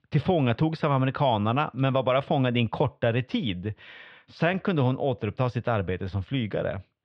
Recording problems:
muffled; slightly; fading above 3.5 kHz

